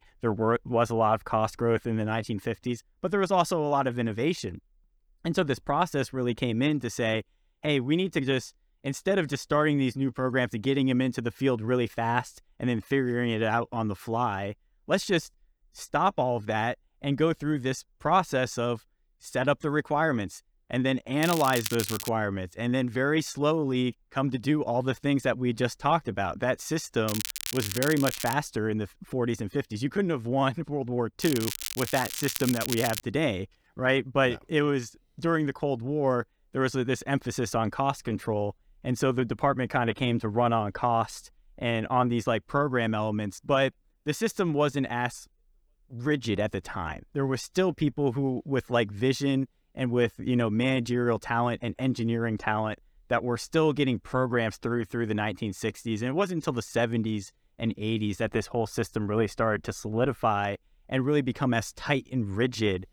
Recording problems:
crackling; loud; at 21 s, from 27 to 28 s and from 31 to 33 s; 5 dB below the speech

